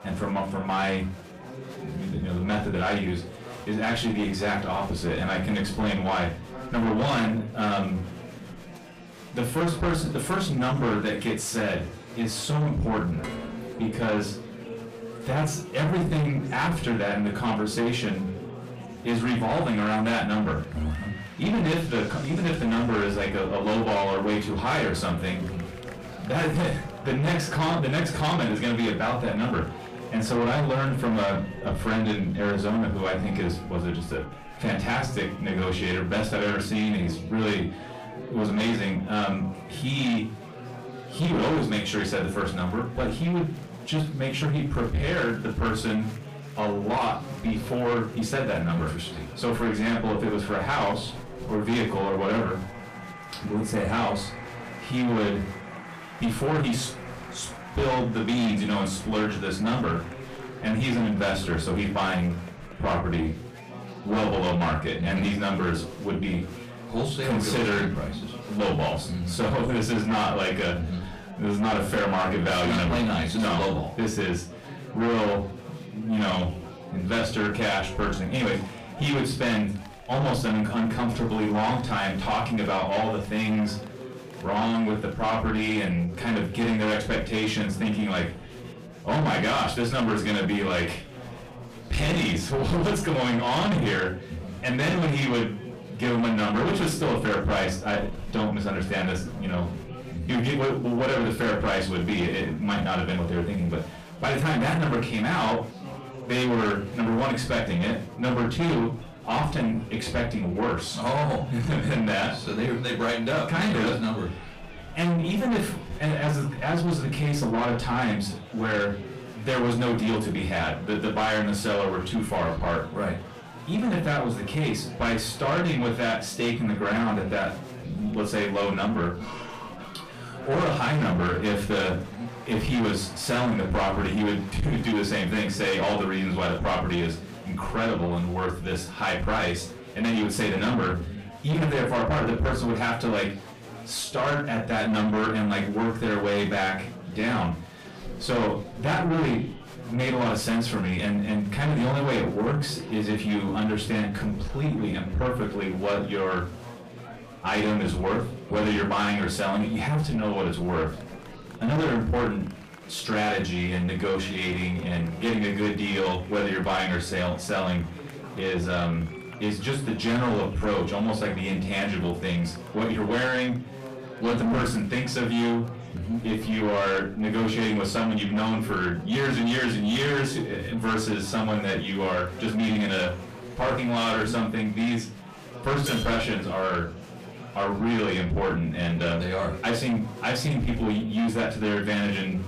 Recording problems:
distortion; heavy; 6 dB below the speech
off-mic speech; far
room echo; slight; dies away in 0.3 s
background music; noticeable; until 59 s; 20 dB below the speech
murmuring crowd; noticeable; throughout; 15 dB below the speech
clattering dishes; noticeable; from 13 to 15 s and at 3:06; peak 4 dB below the speech

